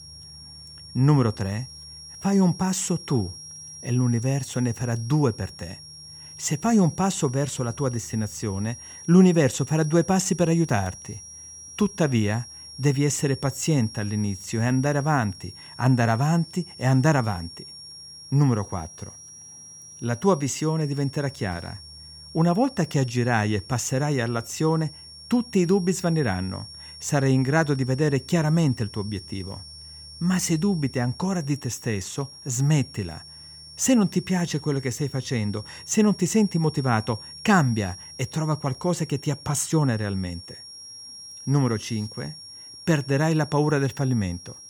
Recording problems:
high-pitched whine; noticeable; throughout; 5.5 kHz, 15 dB below the speech

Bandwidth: 18.5 kHz